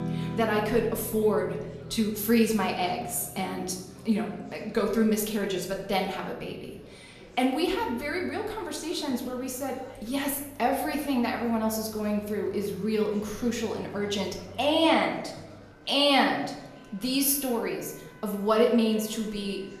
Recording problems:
room echo; slight; dies away in 0.8 s
off-mic speech; somewhat distant
background music; noticeable; throughout; 20 dB below the speech
murmuring crowd; faint; throughout; 25 dB below the speech

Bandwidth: 14 kHz